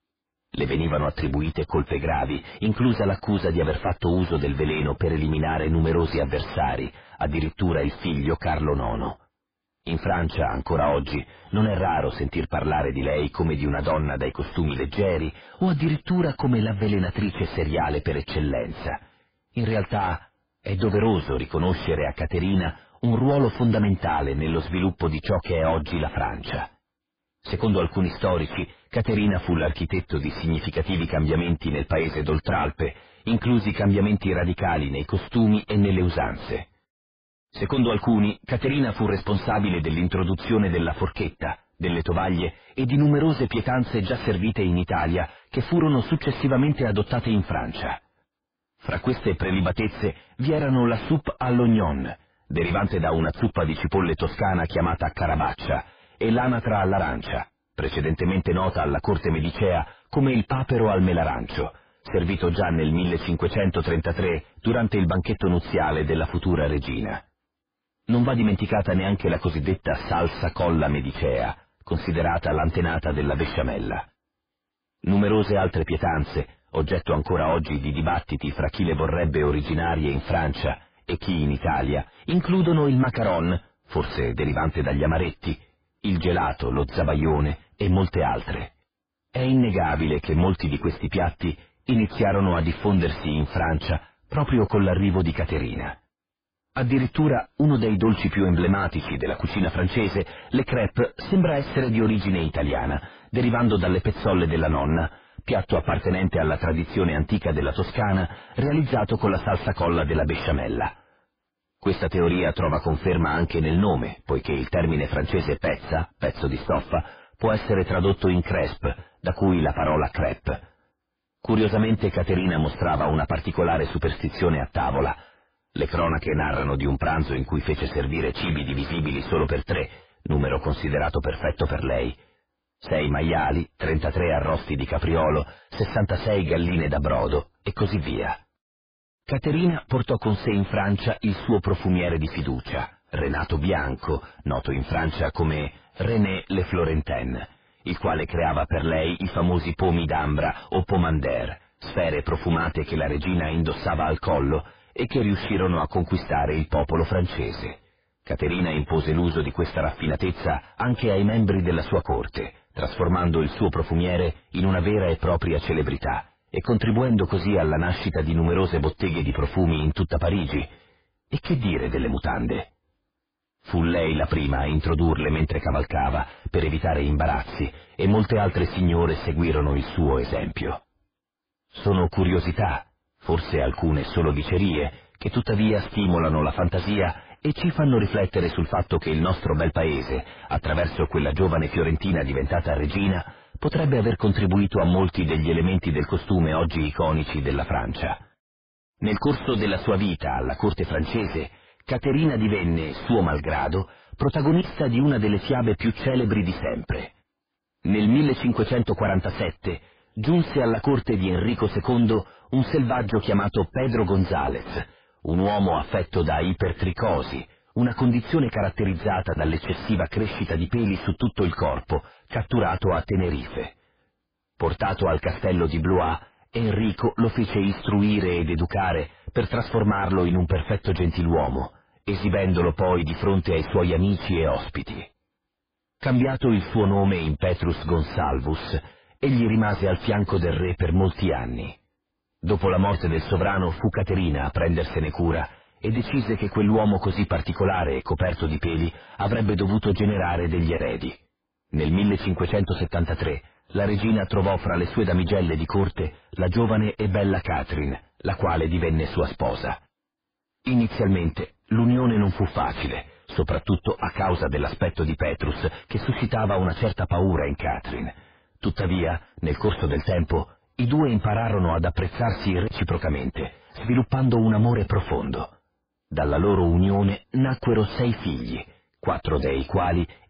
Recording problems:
distortion; heavy; 4 dB below the speech
garbled, watery; badly

